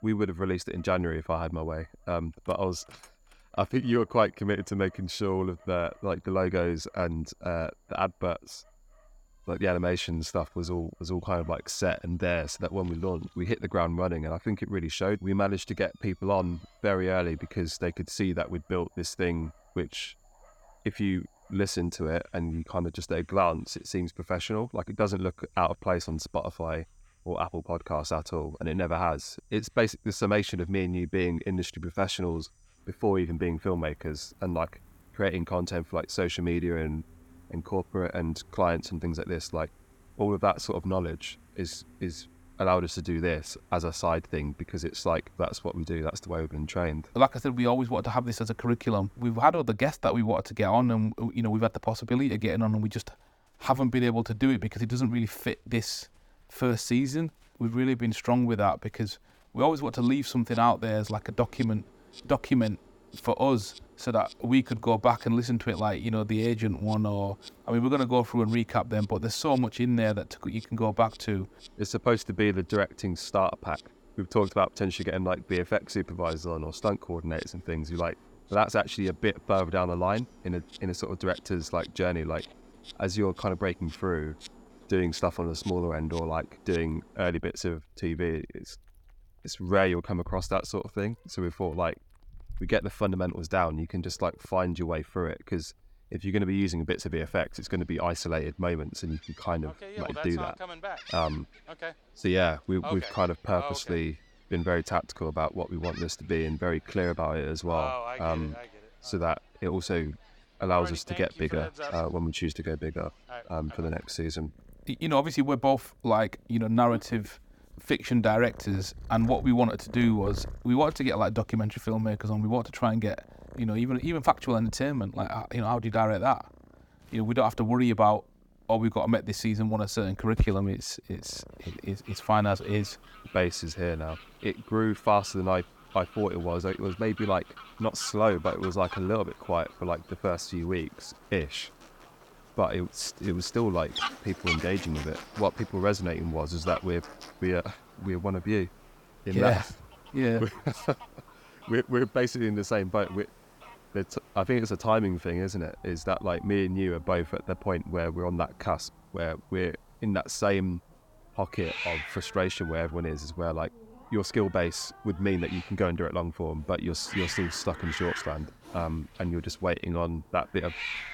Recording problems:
animal sounds; noticeable; throughout; 15 dB below the speech

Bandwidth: 18 kHz